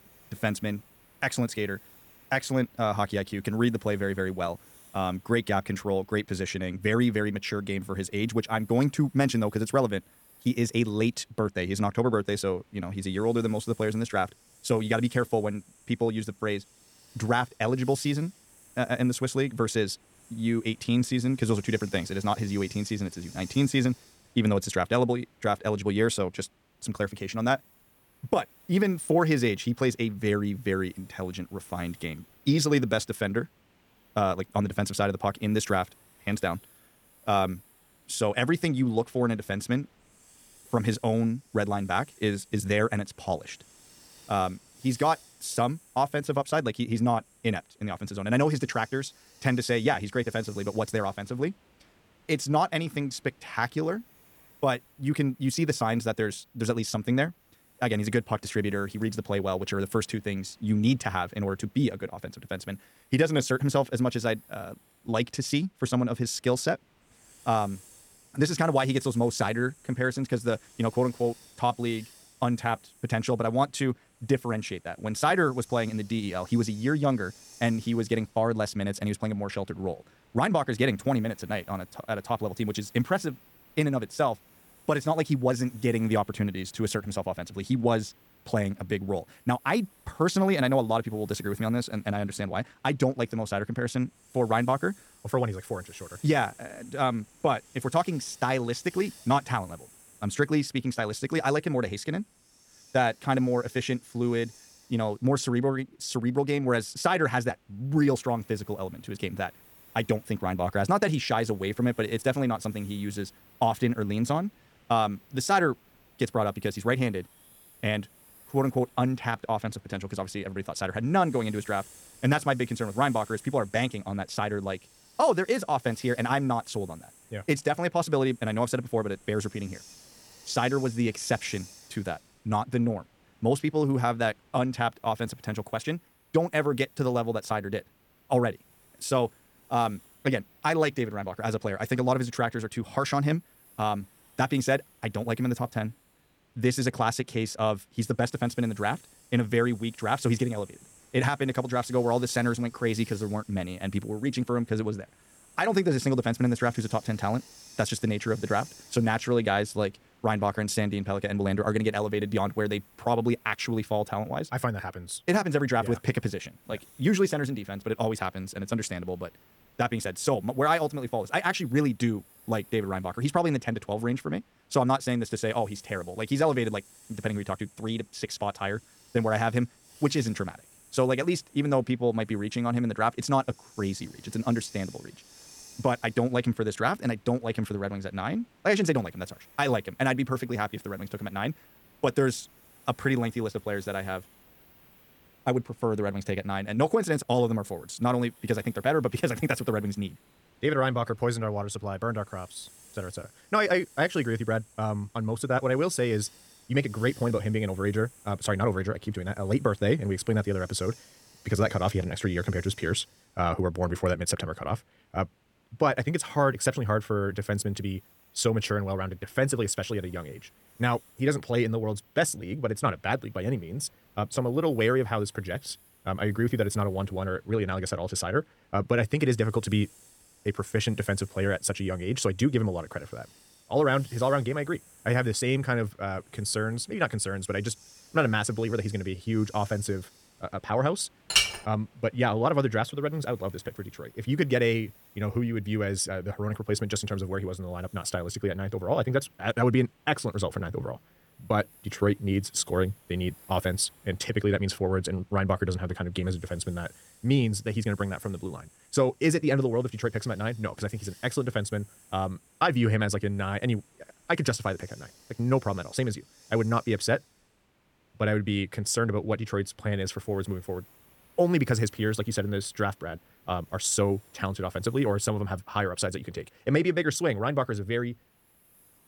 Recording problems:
wrong speed, natural pitch; too fast; 1.5 times normal speed
hiss; faint; throughout; 25 dB below the speech
clattering dishes; loud; at 4:01; peak 6 dB above the speech

